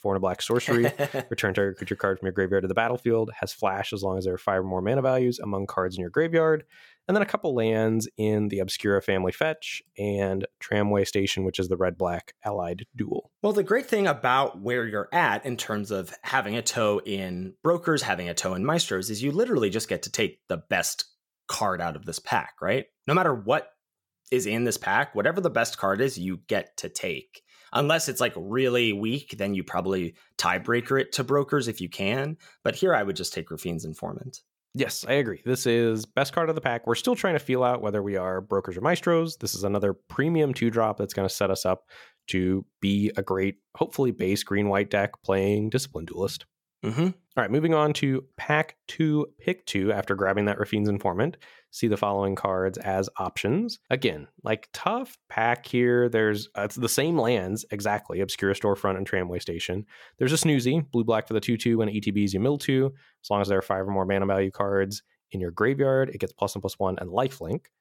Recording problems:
none

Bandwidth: 17.5 kHz